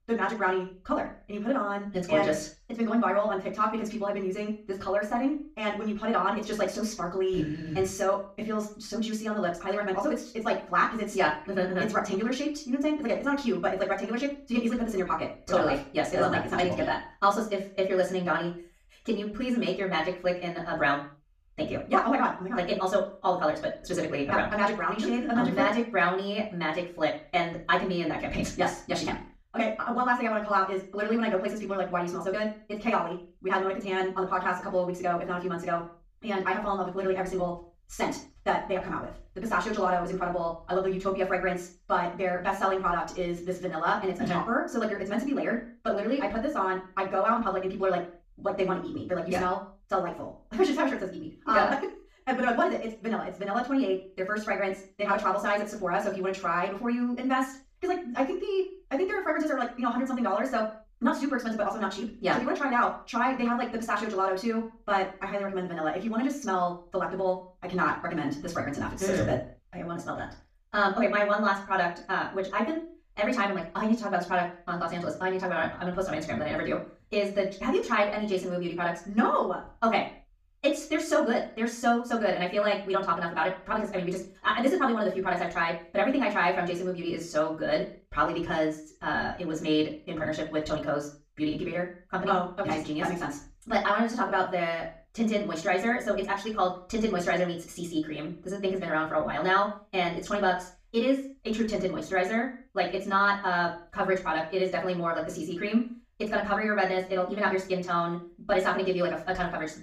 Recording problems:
off-mic speech; far
wrong speed, natural pitch; too fast; 1.8 times normal speed
room echo; slight; dies away in 0.3 s

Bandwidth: 14.5 kHz